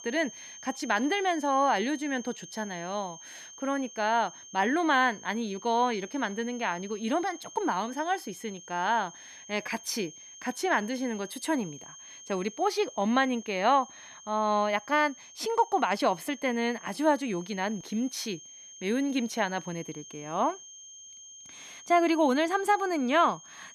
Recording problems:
high-pitched whine; noticeable; throughout; 6.5 kHz, 15 dB below the speech

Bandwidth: 14.5 kHz